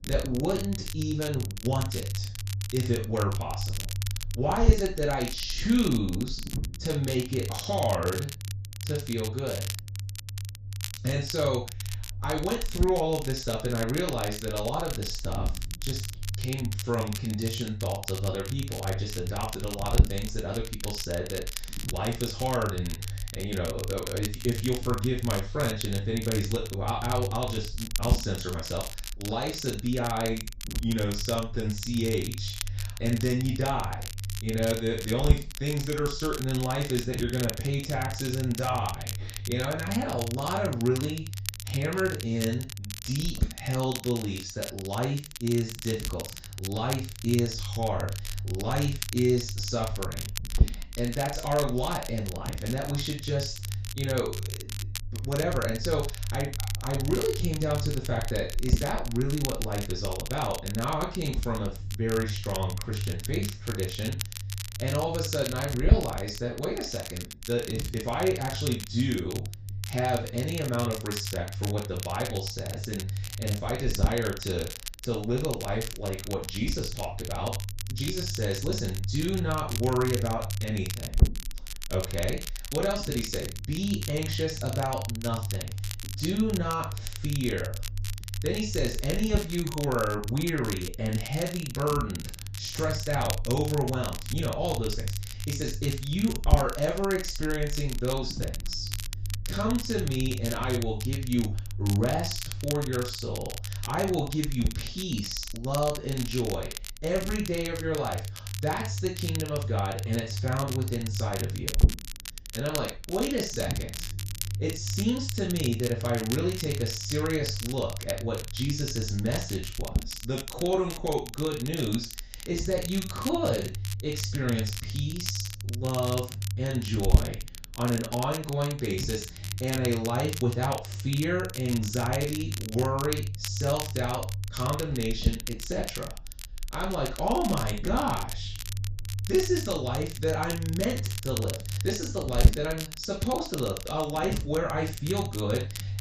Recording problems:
off-mic speech; far
room echo; noticeable; dies away in 0.3 s
high frequencies cut off; noticeable; nothing above 8 kHz
crackle, like an old record; loud; 9 dB below the speech
low rumble; noticeable; throughout; 15 dB below the speech

